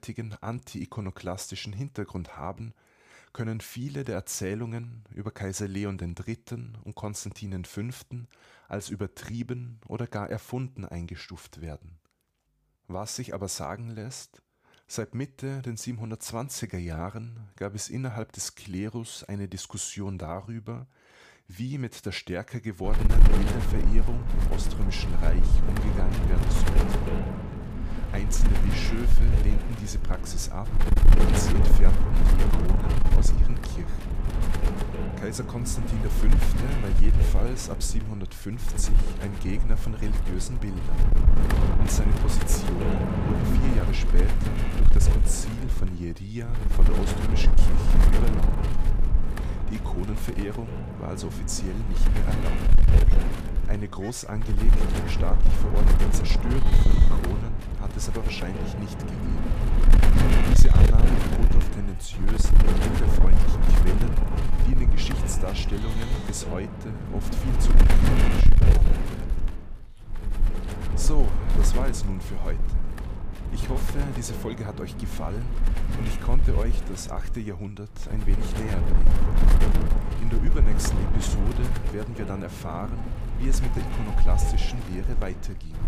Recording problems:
wind noise on the microphone; heavy; from 23 s on; 2 dB above the speech
animal sounds; noticeable; from 44 s on; 15 dB below the speech

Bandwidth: 15 kHz